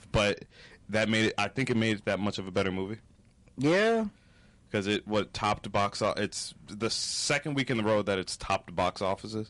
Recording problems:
distortion; slight; 6% of the sound clipped
garbled, watery; slightly; nothing above 11 kHz

